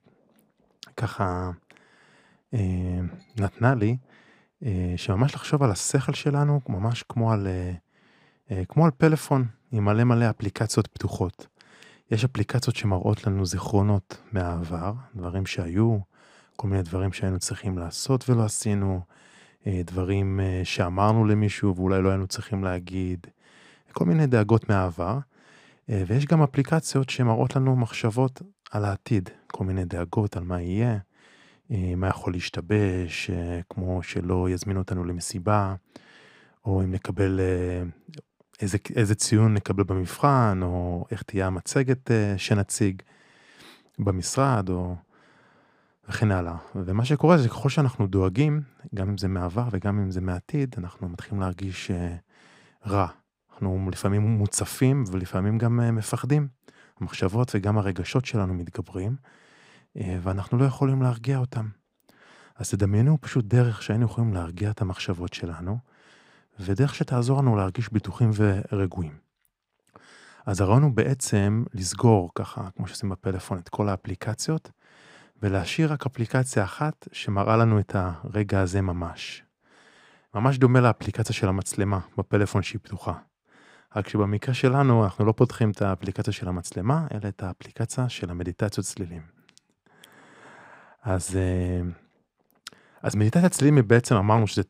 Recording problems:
none

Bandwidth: 15.5 kHz